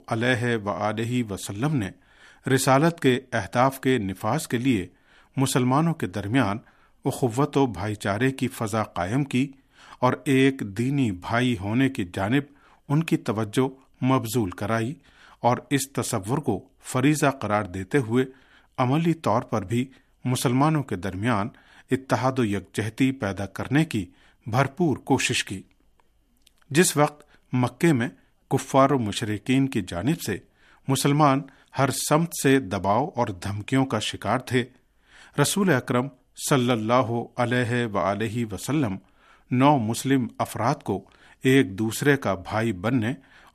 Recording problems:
none

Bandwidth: 14.5 kHz